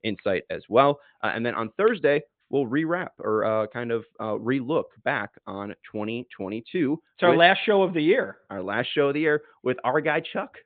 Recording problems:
high frequencies cut off; severe; nothing above 4 kHz

